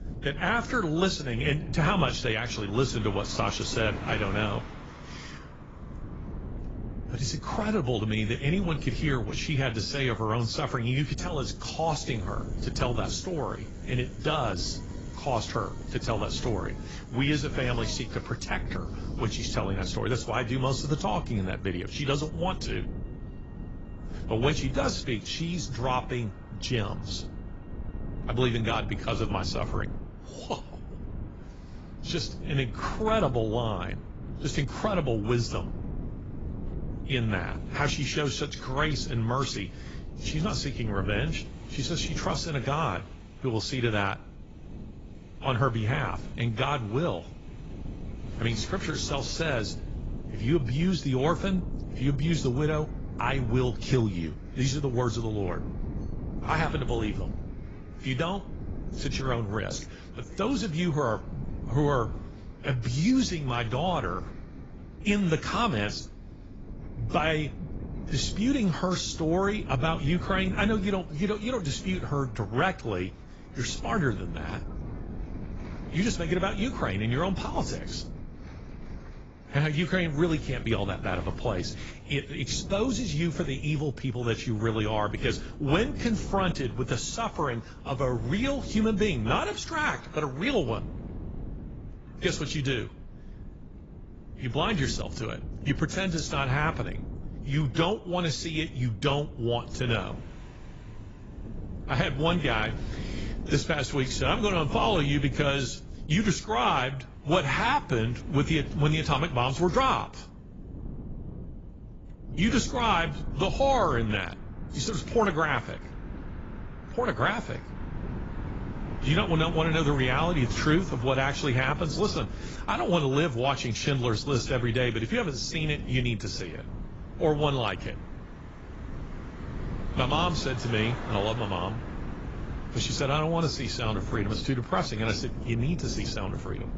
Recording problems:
garbled, watery; badly; nothing above 7.5 kHz
wind noise on the microphone; occasional gusts; 20 dB below the speech
traffic noise; faint; throughout; 25 dB below the speech

